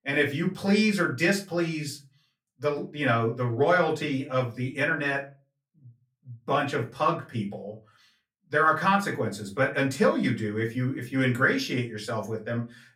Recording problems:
off-mic speech; far
room echo; very slight; dies away in 0.3 s

